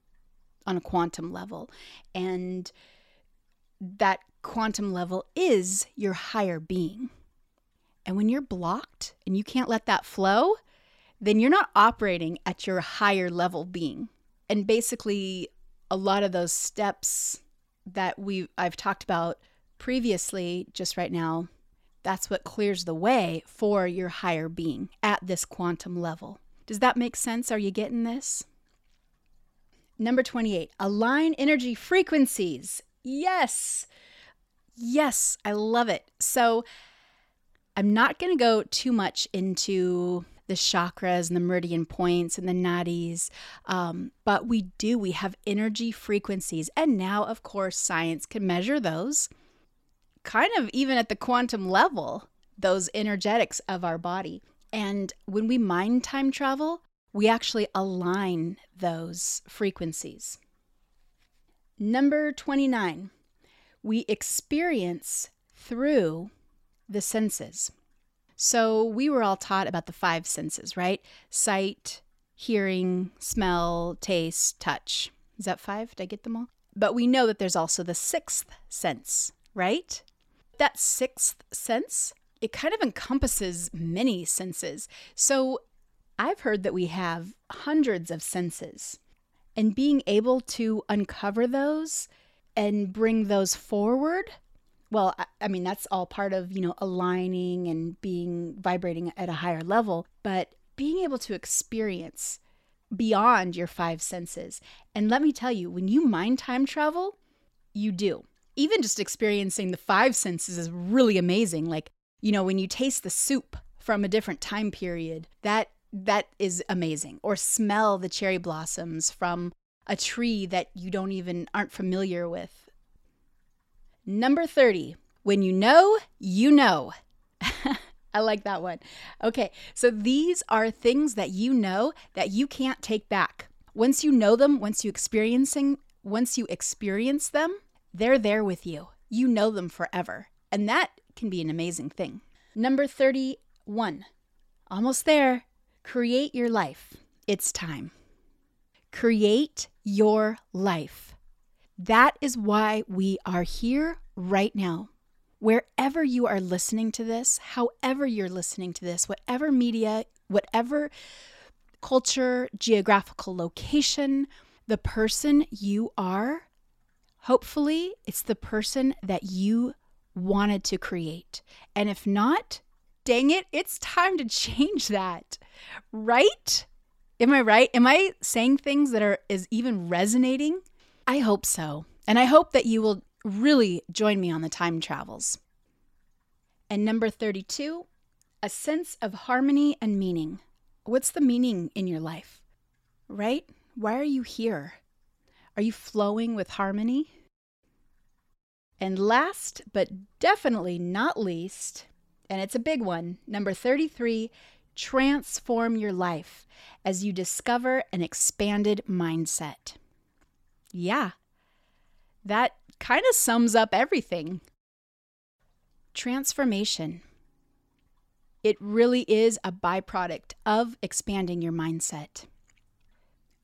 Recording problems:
none

